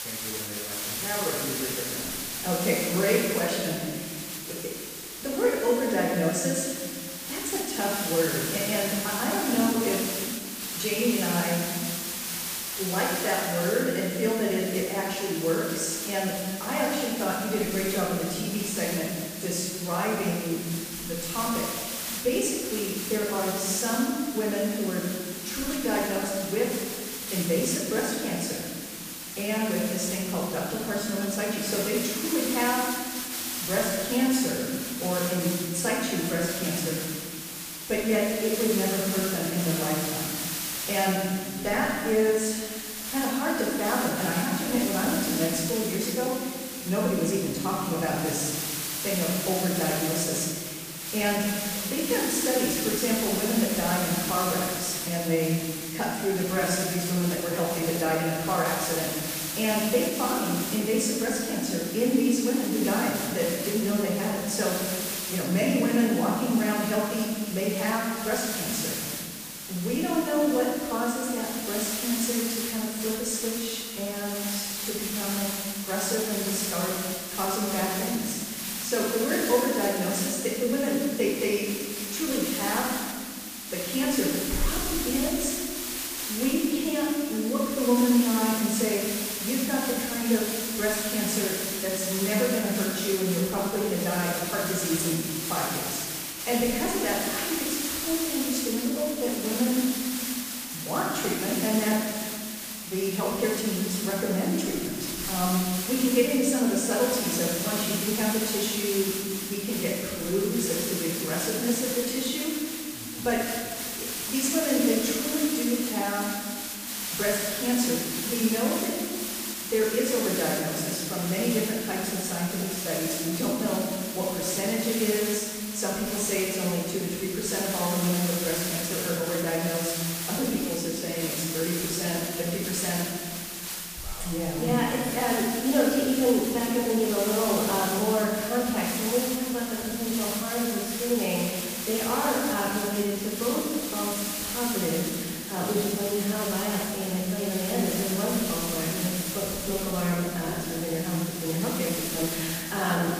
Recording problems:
room echo; strong; dies away in 1.7 s
off-mic speech; far
hiss; loud; throughout; 4 dB below the speech

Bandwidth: 15 kHz